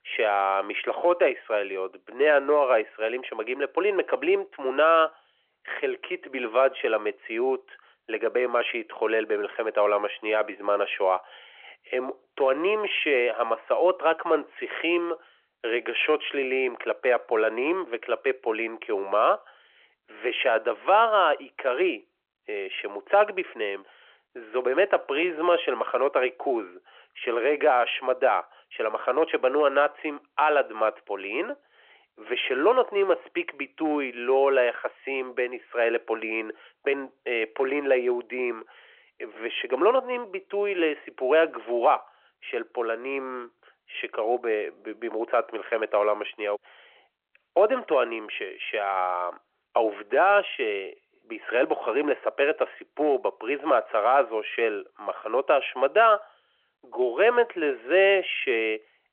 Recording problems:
phone-call audio; nothing above 3 kHz

